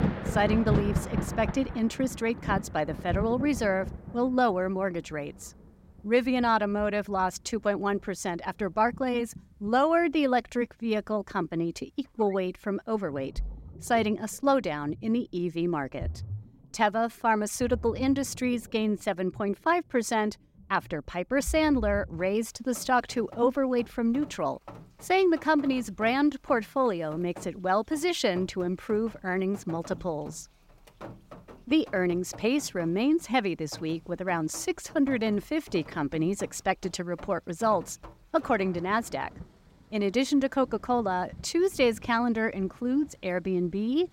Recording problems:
rain or running water; noticeable; throughout; 10 dB below the speech

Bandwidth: 16 kHz